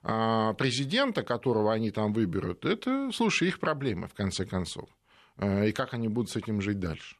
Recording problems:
none

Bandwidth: 13.5 kHz